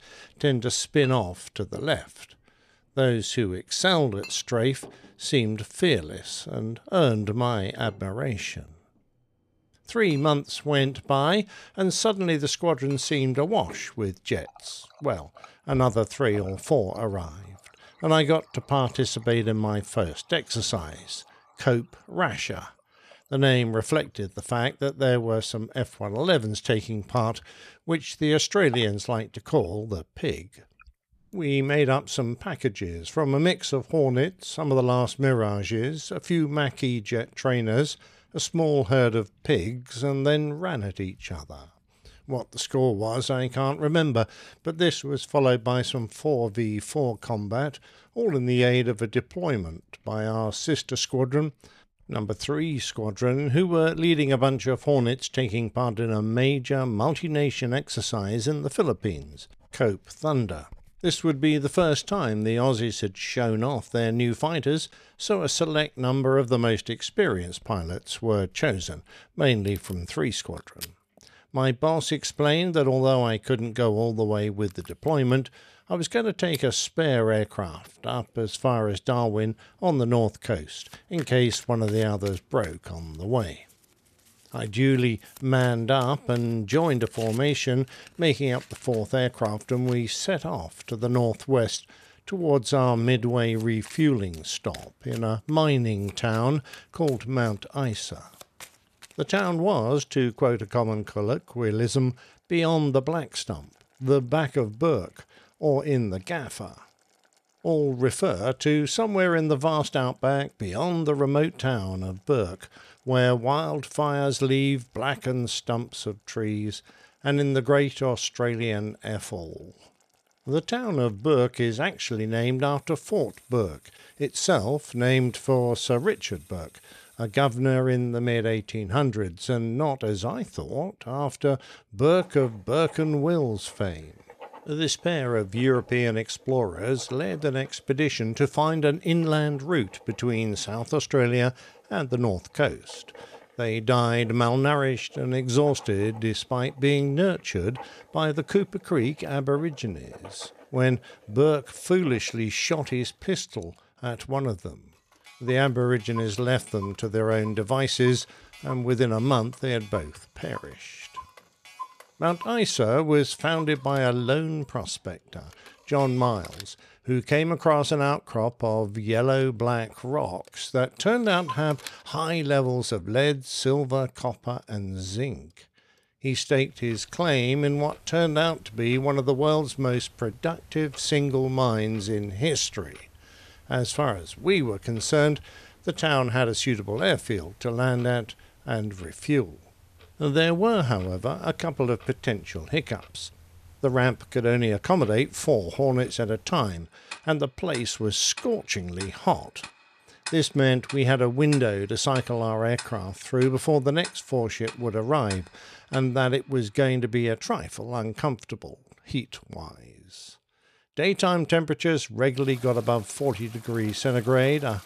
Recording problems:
household noises; faint; throughout; 20 dB below the speech

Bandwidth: 14 kHz